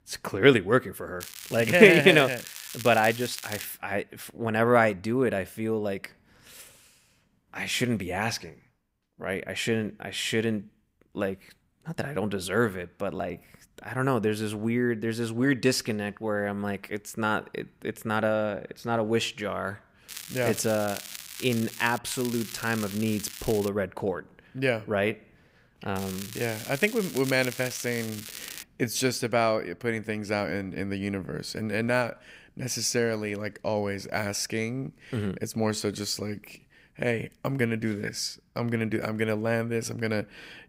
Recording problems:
crackling; noticeable; 4 times, first at 1 s; 10 dB below the speech

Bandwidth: 15.5 kHz